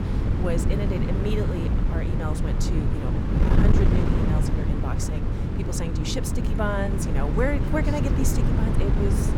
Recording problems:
wind noise on the microphone; heavy; 1 dB below the speech

